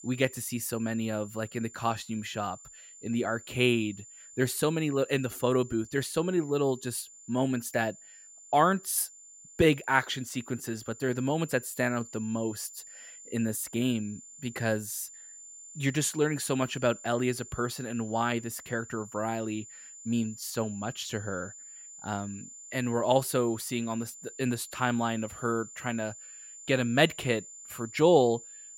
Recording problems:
high-pitched whine; noticeable; throughout; 7 kHz, 15 dB below the speech

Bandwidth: 16 kHz